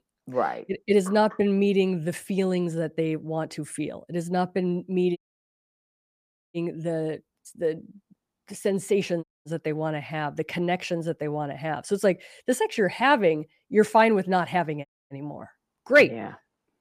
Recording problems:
audio cutting out; at 5 s for 1.5 s, at 9 s and at 15 s

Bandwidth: 15 kHz